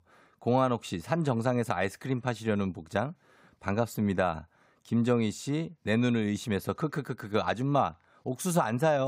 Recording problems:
abrupt cut into speech; at the end

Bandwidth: 15.5 kHz